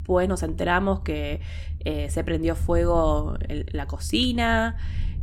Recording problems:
low rumble; faint; throughout; 25 dB below the speech

